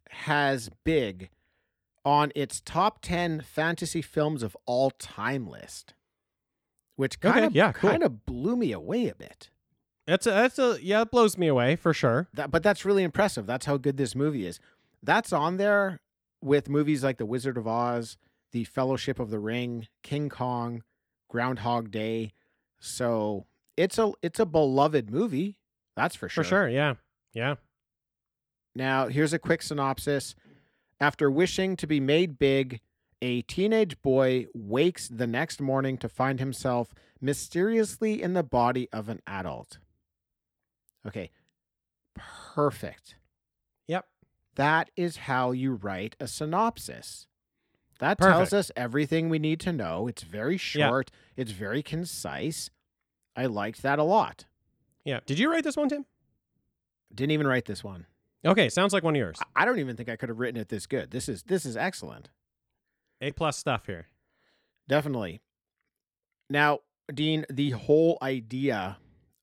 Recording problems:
none

